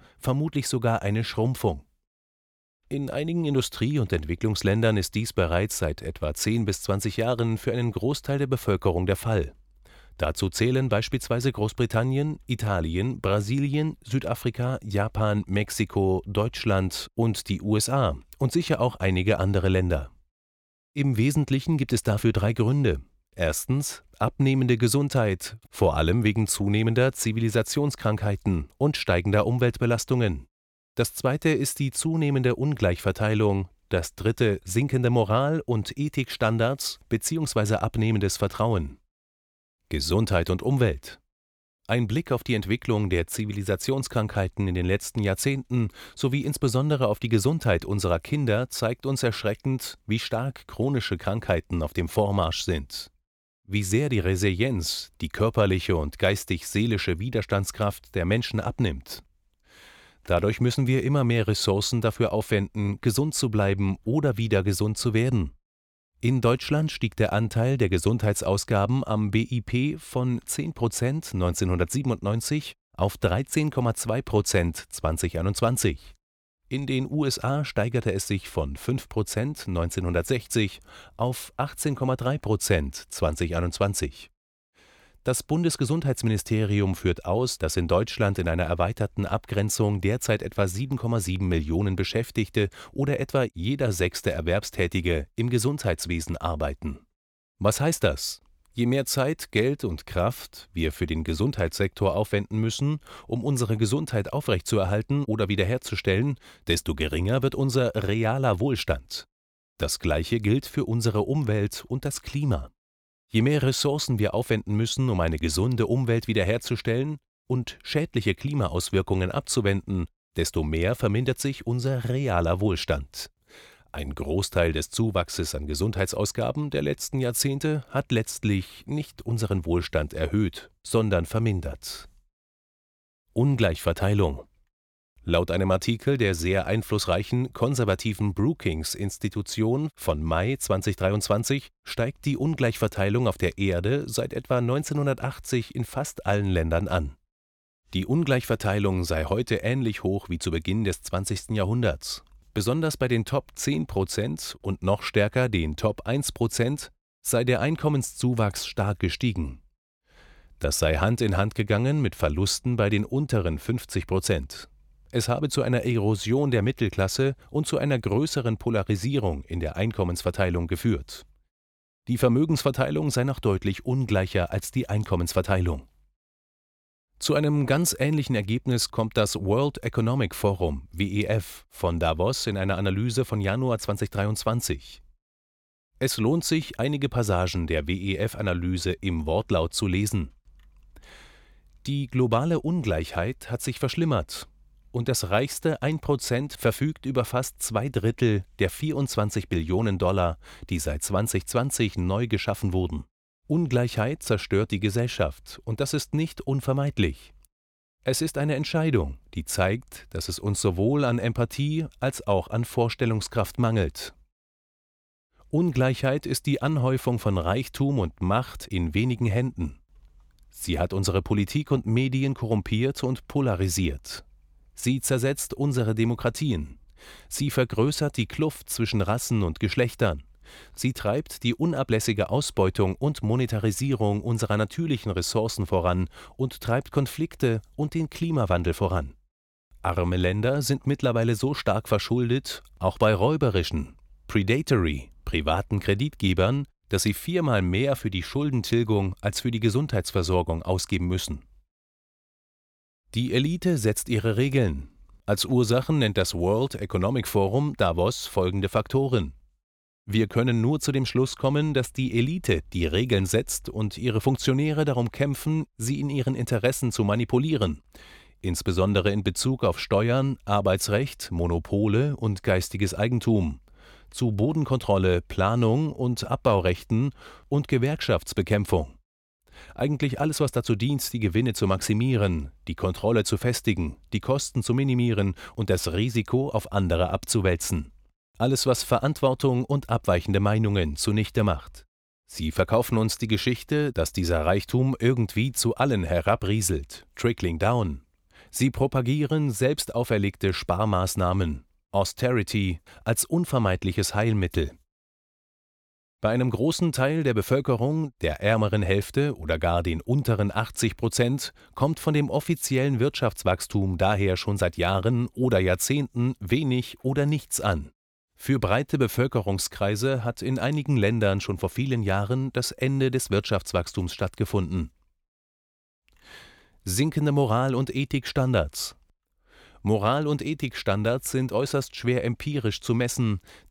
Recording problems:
none

